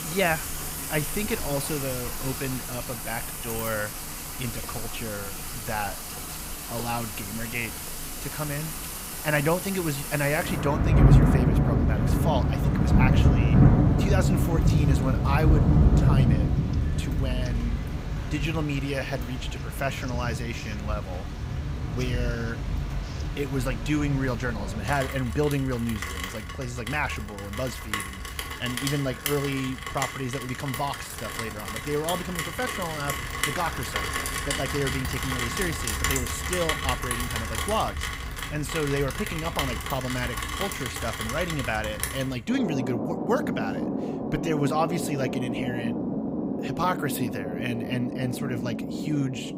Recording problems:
rain or running water; very loud; throughout; 2 dB above the speech
household noises; faint; throughout; 25 dB below the speech

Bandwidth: 15.5 kHz